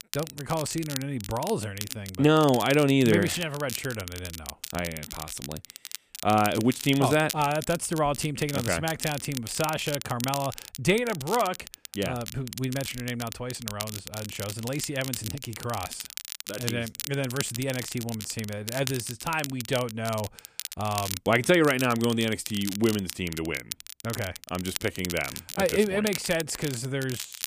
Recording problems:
crackle, like an old record; loud; 9 dB below the speech

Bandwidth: 15 kHz